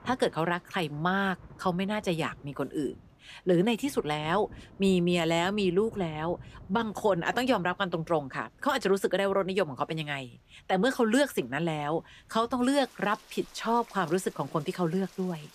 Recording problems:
rain or running water; faint; throughout; 25 dB below the speech

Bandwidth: 14.5 kHz